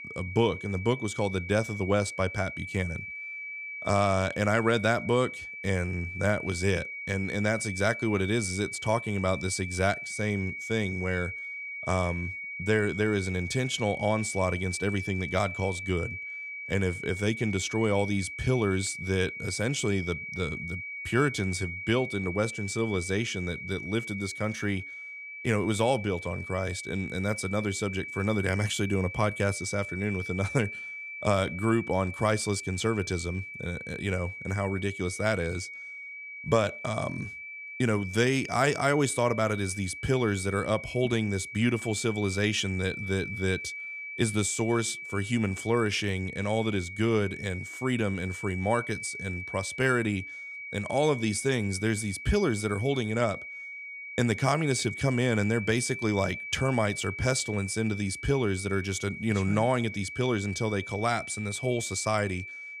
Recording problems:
high-pitched whine; loud; throughout; 2.5 kHz, 8 dB below the speech

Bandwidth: 15.5 kHz